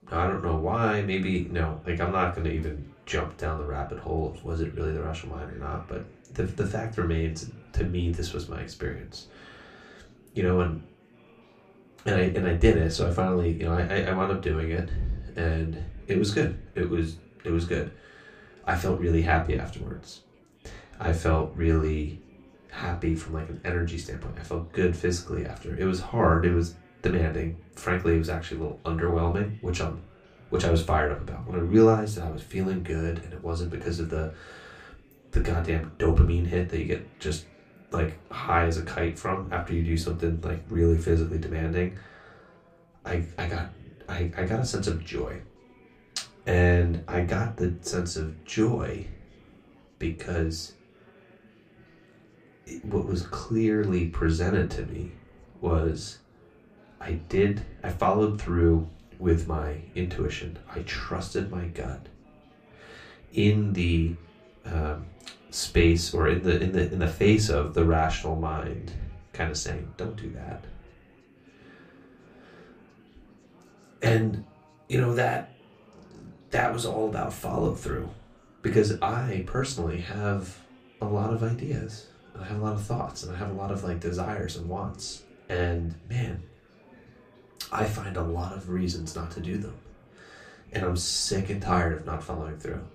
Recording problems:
room echo; very slight; dies away in 0.2 s
off-mic speech; somewhat distant
chatter from many people; faint; throughout; 30 dB below the speech

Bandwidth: 15 kHz